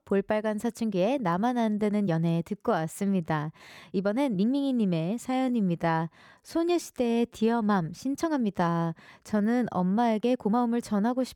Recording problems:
uneven, jittery; strongly; from 1 to 11 s

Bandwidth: 18 kHz